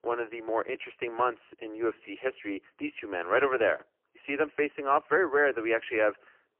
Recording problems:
phone-call audio; poor line; nothing above 3 kHz
thin; very; fading below 400 Hz

